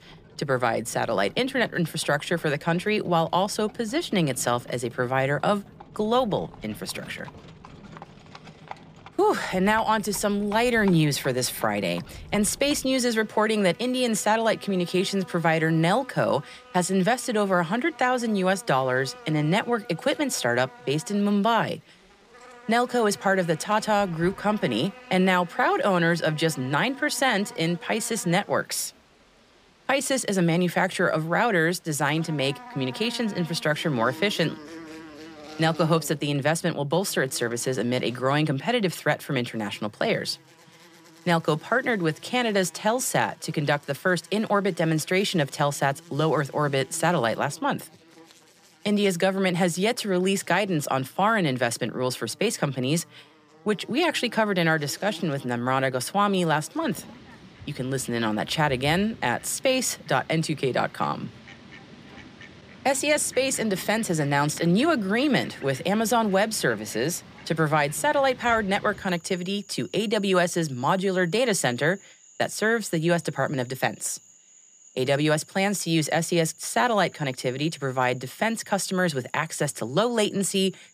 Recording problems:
animal sounds; faint; throughout; 20 dB below the speech

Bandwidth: 15 kHz